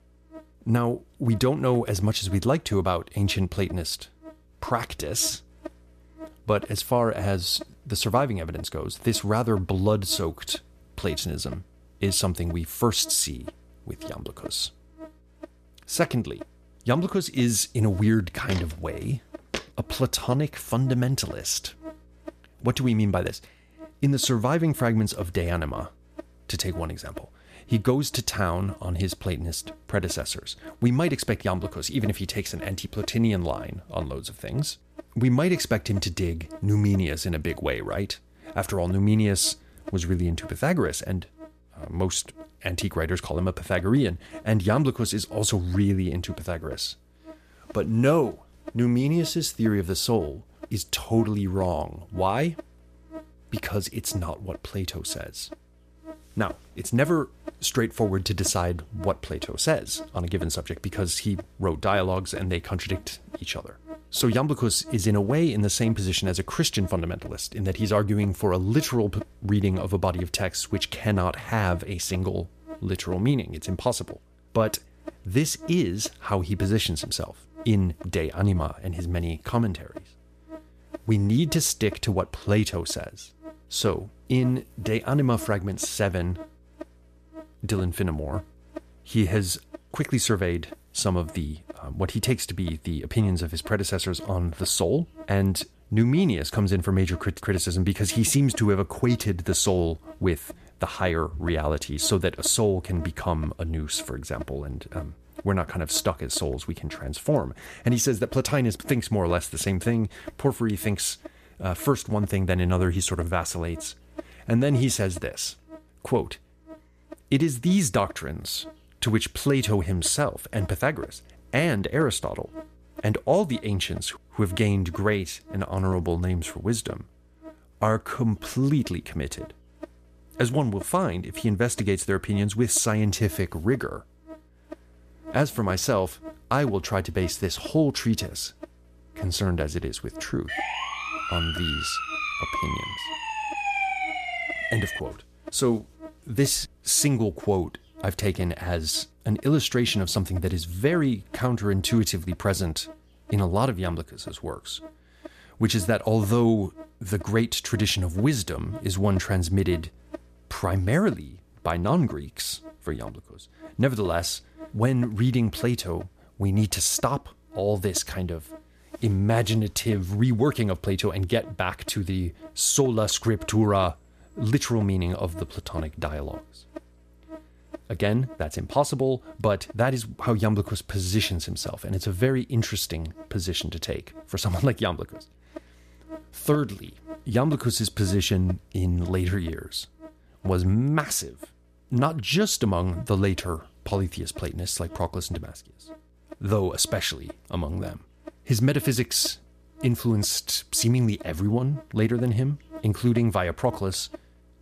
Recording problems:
electrical hum; noticeable; throughout; 60 Hz, 20 dB below the speech
footsteps; noticeable; from 18 to 20 s; peak 9 dB below the speech
siren; loud; from 2:20 to 2:25; peak level with the speech

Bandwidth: 14.5 kHz